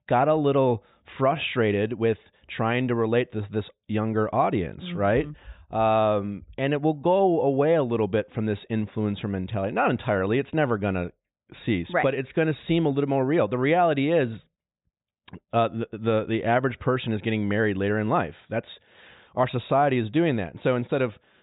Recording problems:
high frequencies cut off; severe; nothing above 4 kHz

